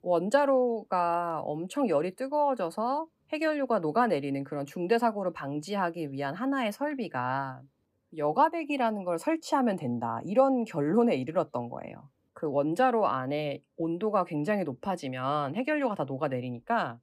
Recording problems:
none

